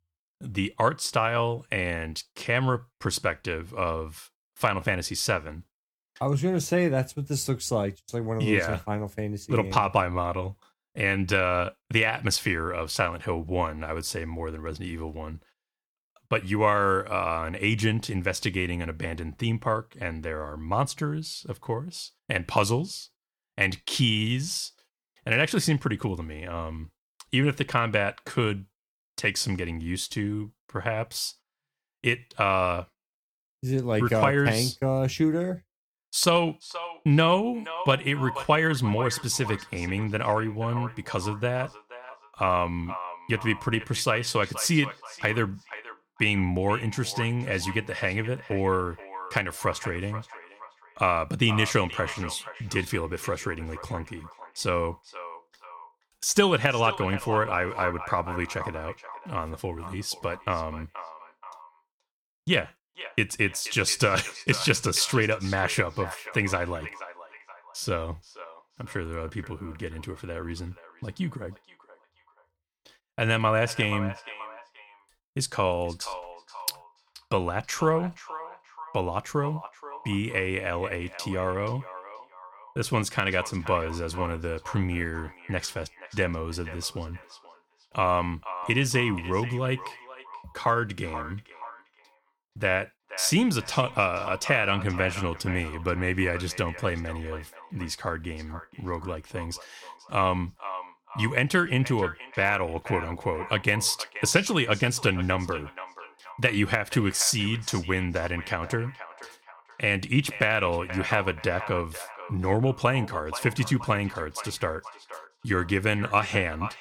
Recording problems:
echo of what is said; noticeable; from 36 s on; 480 ms later, 15 dB below the speech

